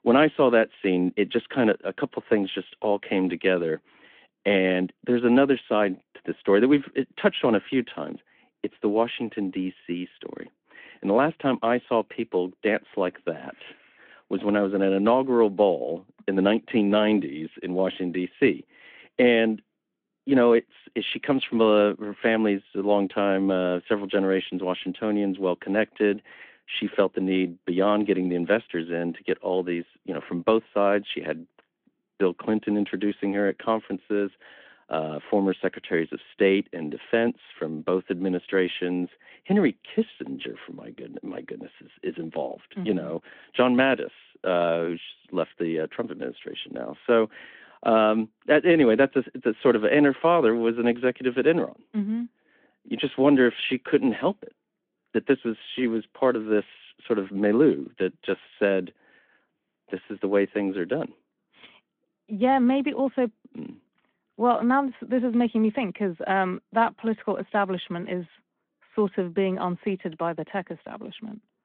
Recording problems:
phone-call audio

